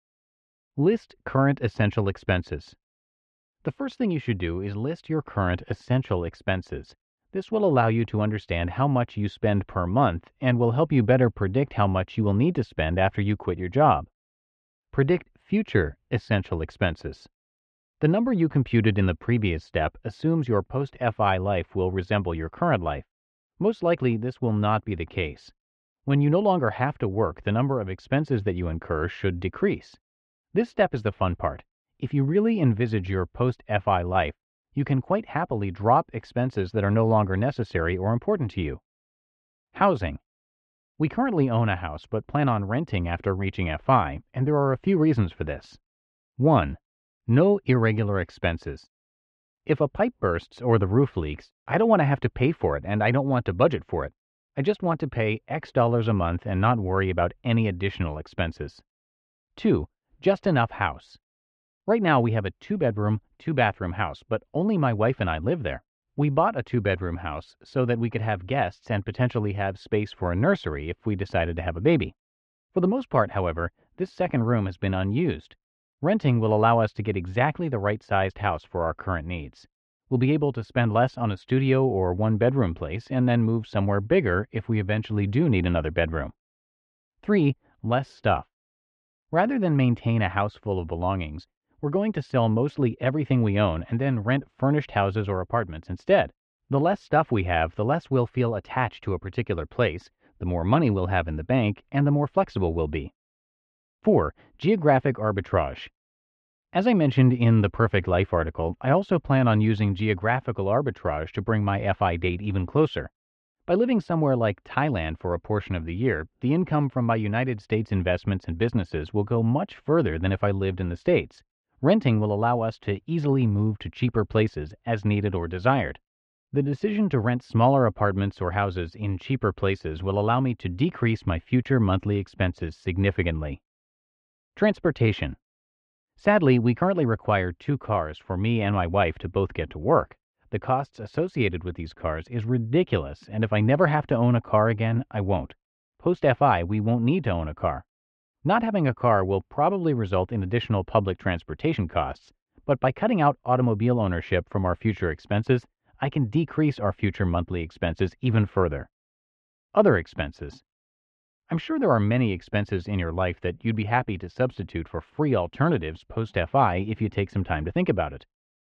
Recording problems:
muffled; very; fading above 3 kHz

